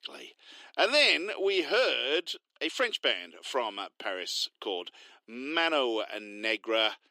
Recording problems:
thin; very; fading below 300 Hz

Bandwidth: 15.5 kHz